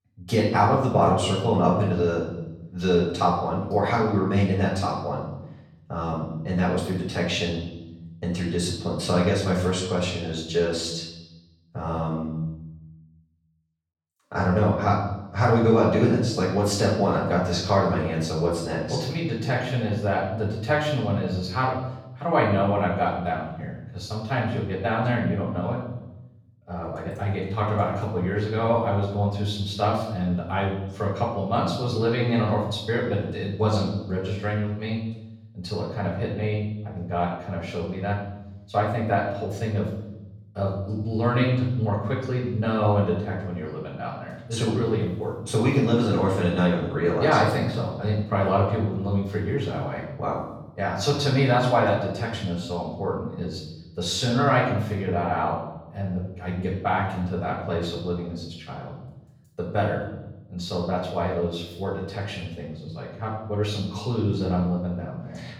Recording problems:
off-mic speech; far
room echo; noticeable; dies away in 1 s

